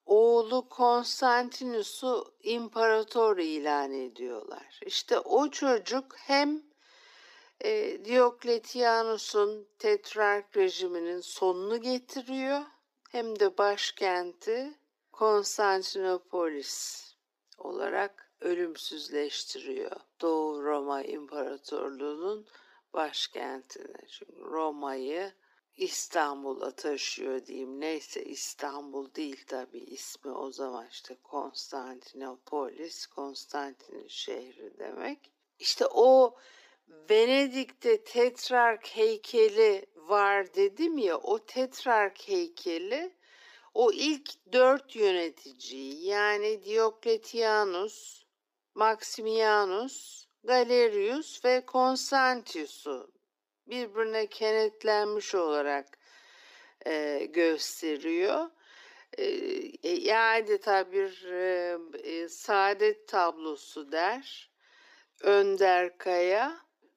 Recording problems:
wrong speed, natural pitch; too slow; 0.7 times normal speed
thin; somewhat; fading below 300 Hz

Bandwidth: 15 kHz